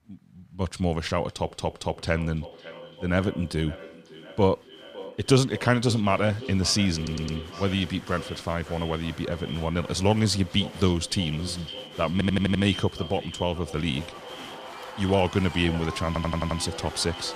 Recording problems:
echo of what is said; noticeable; throughout; 560 ms later, 15 dB below the speech
crowd noise; noticeable; throughout; 20 dB below the speech
audio stuttering; 4 times, first at 1.5 s

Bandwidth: 15 kHz